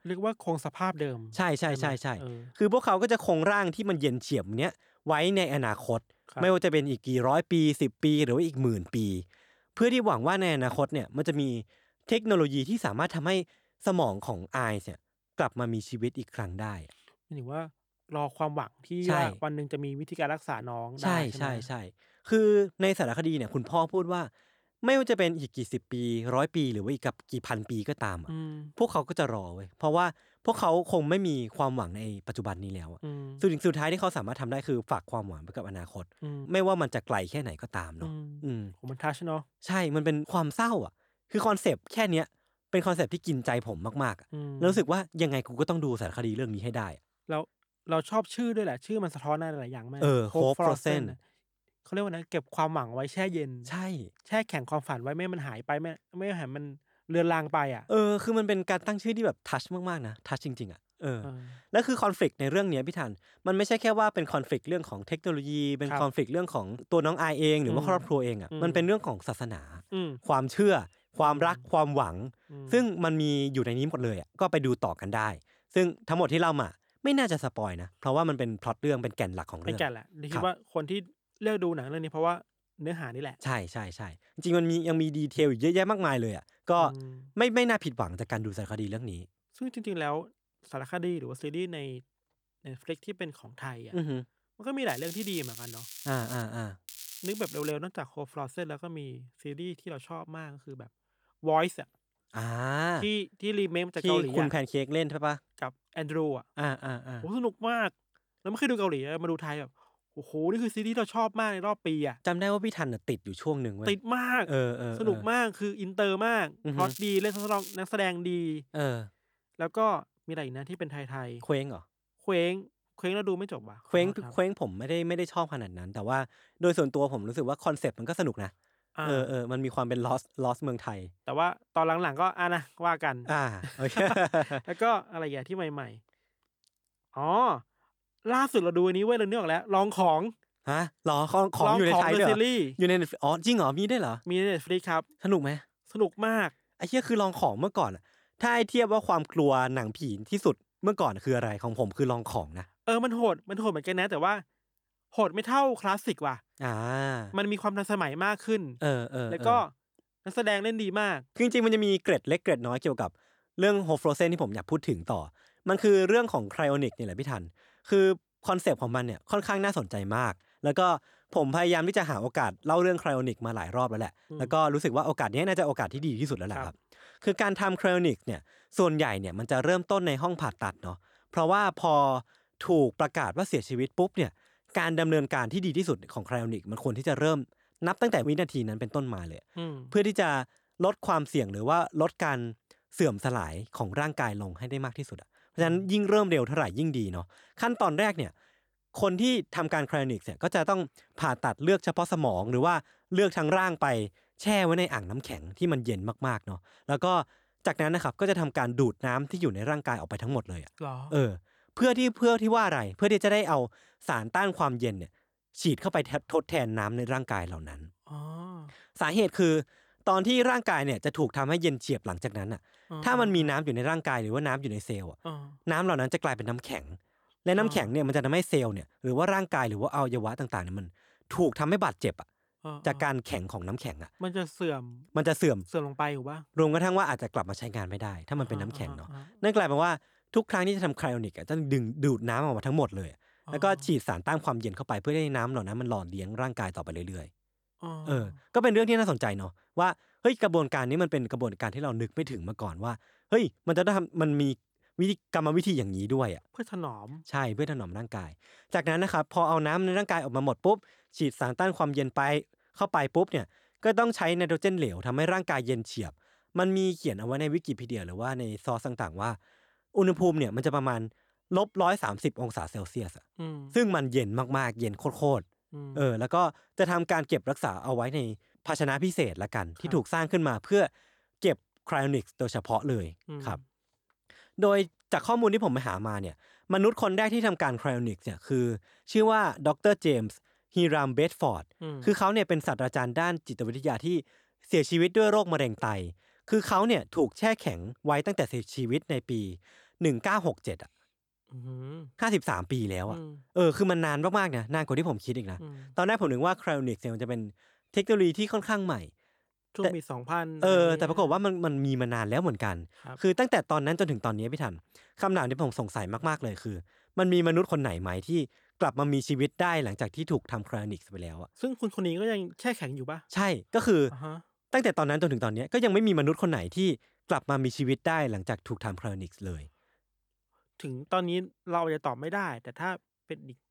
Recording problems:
crackling; noticeable; from 1:35 to 1:36, at 1:37 and at 1:57; 15 dB below the speech

